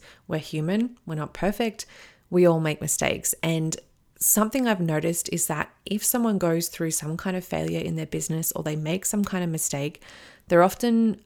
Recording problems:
none

